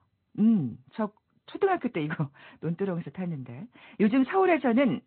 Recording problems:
high frequencies cut off; severe; nothing above 4 kHz
garbled, watery; slightly

